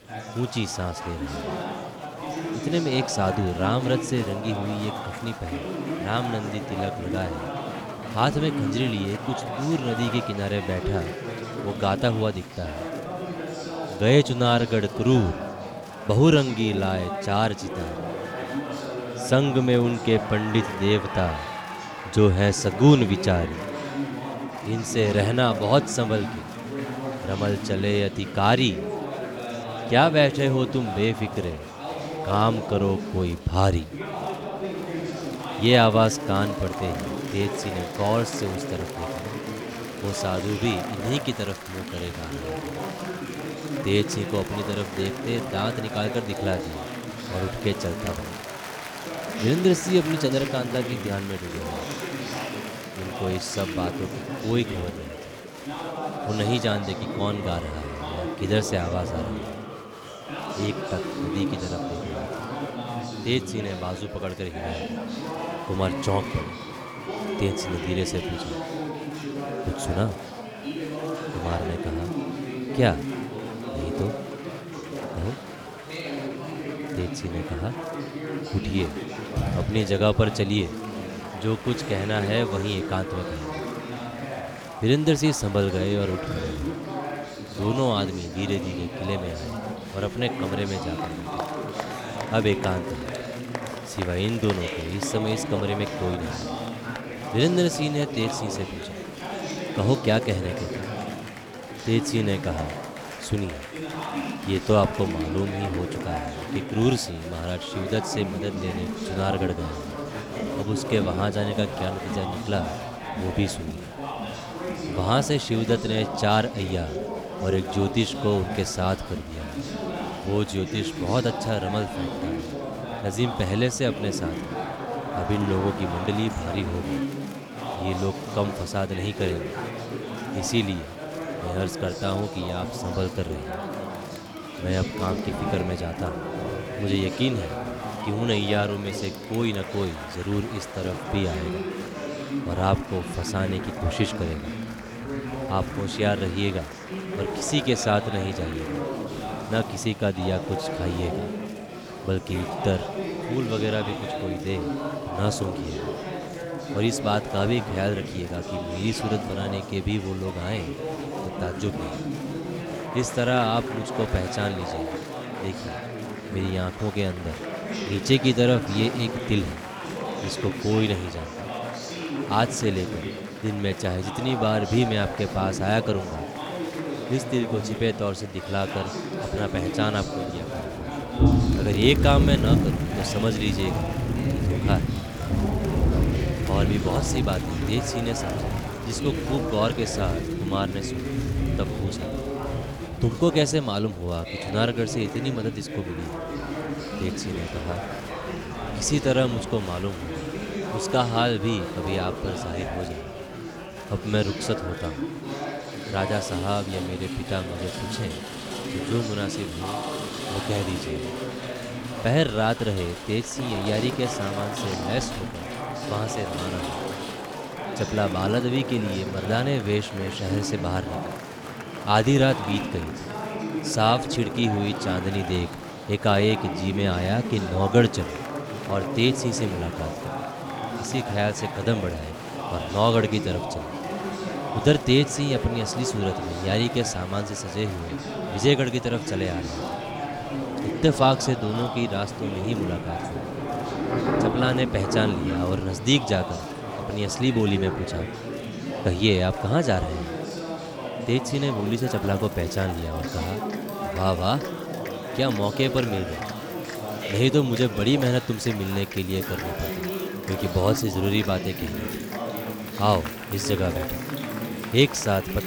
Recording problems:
rain or running water; loud; throughout; 8 dB below the speech
chatter from many people; loud; throughout; 6 dB below the speech
electrical hum; faint; throughout; 60 Hz, 25 dB below the speech

